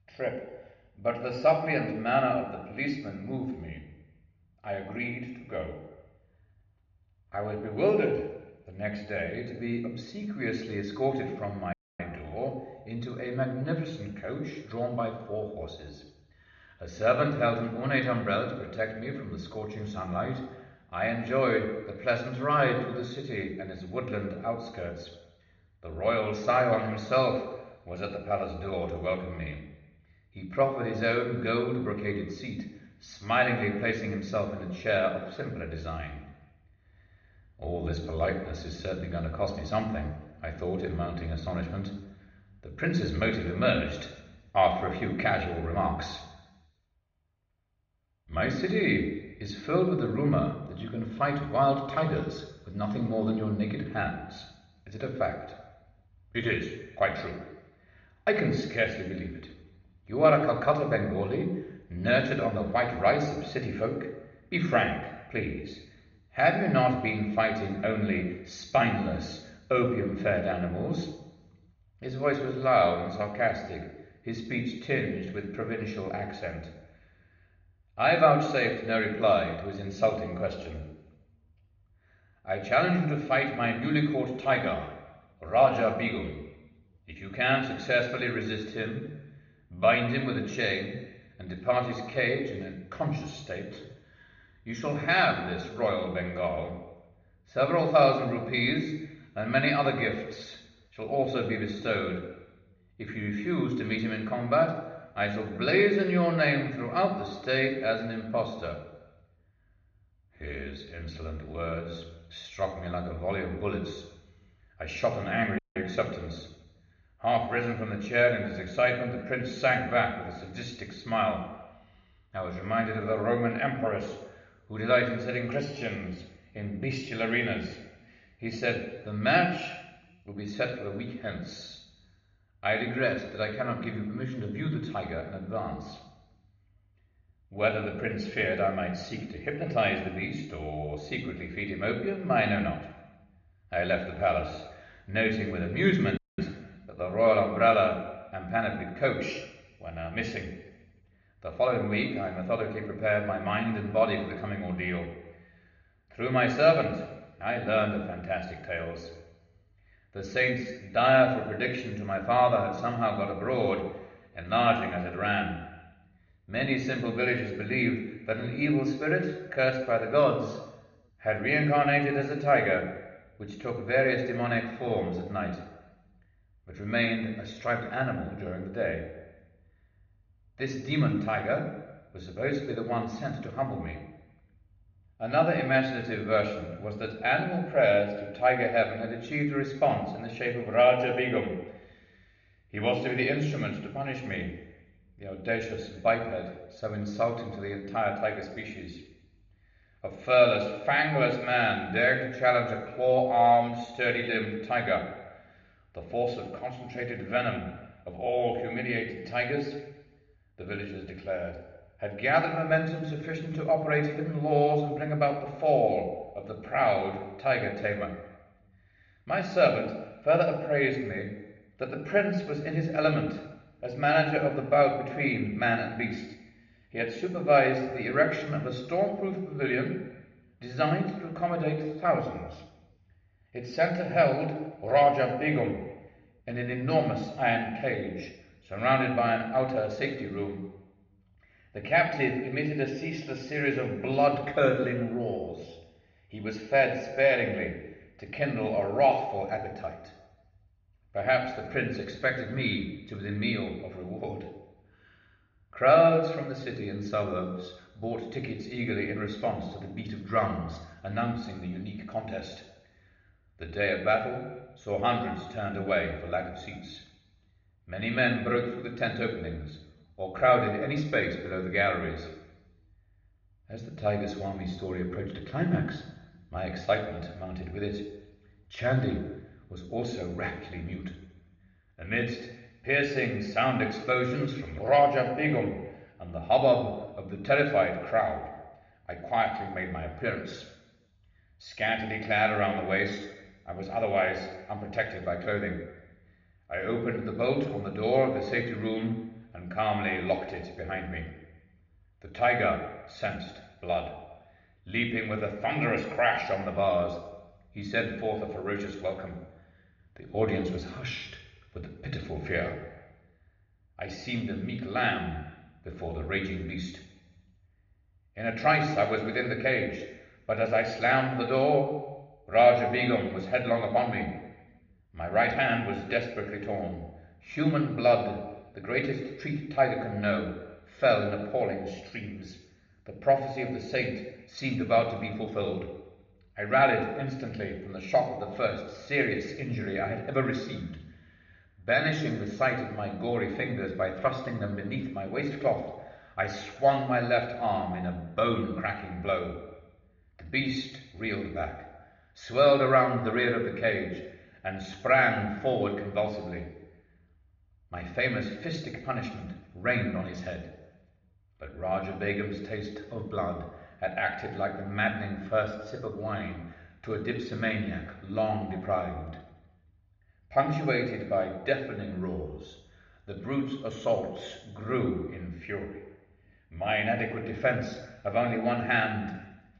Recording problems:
room echo; noticeable; dies away in 0.9 s
high frequencies cut off; noticeable; nothing above 7 kHz
off-mic speech; somewhat distant
muffled; very slightly; fading above 2.5 kHz
audio cutting out; at 12 s, at 1:56 and at 2:26

